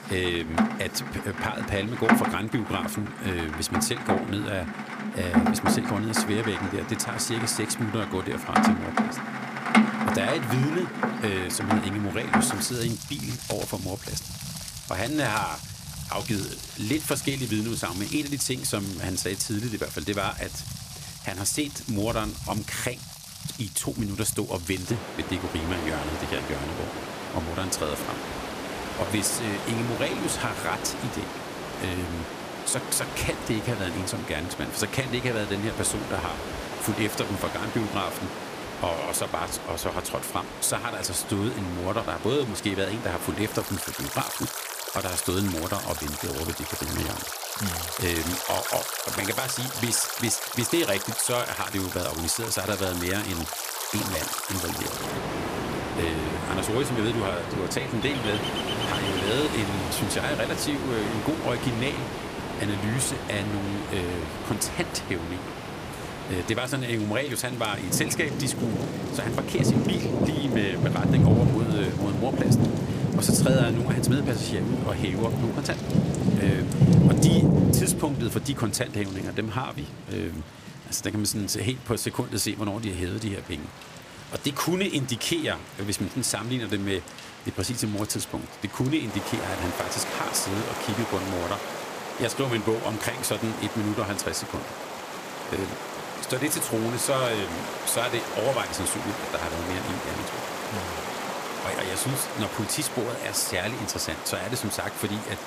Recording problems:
rain or running water; loud; throughout; 1 dB below the speech

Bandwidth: 15 kHz